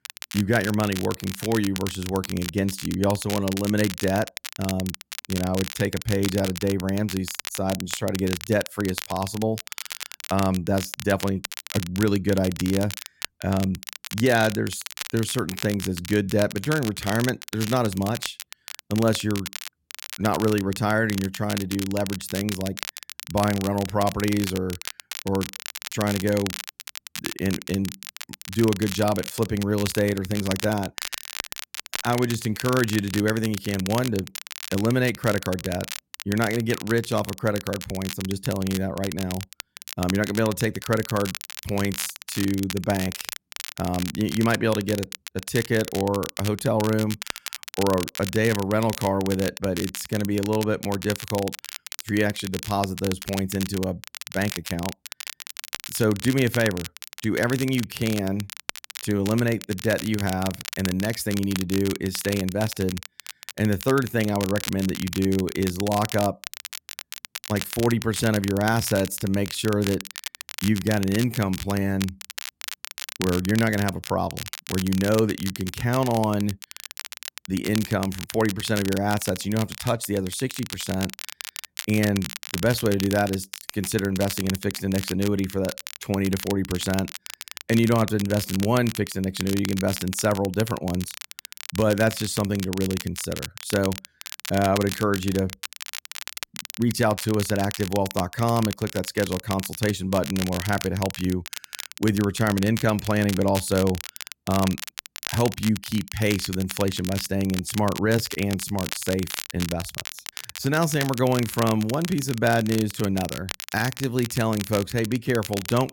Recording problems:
crackle, like an old record; loud; 9 dB below the speech

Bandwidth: 17 kHz